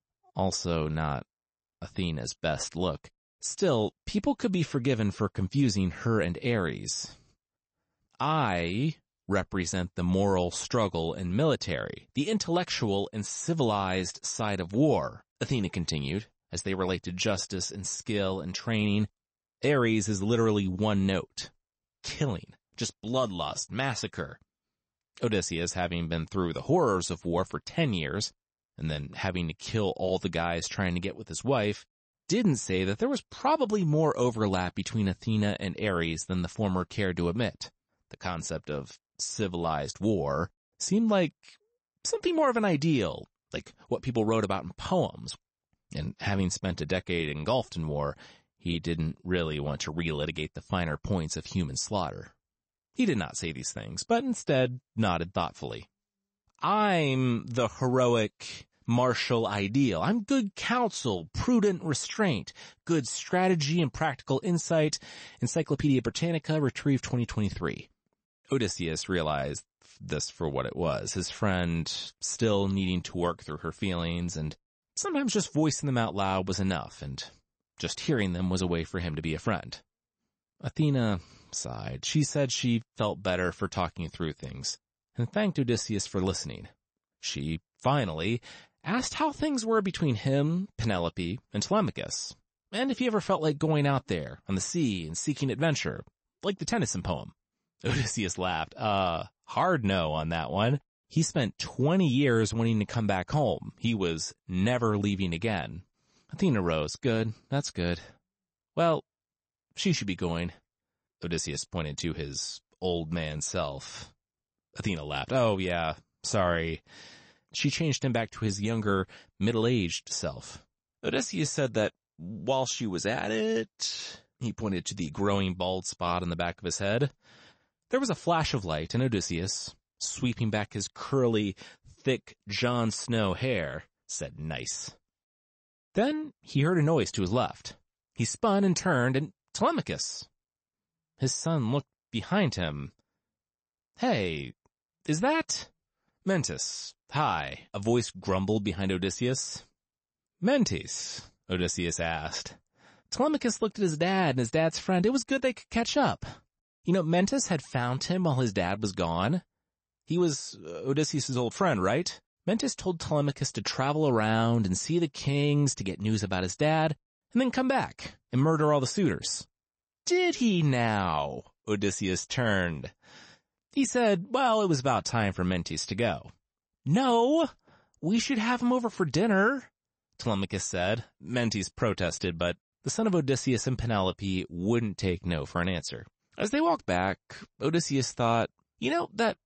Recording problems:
garbled, watery; slightly; nothing above 8 kHz

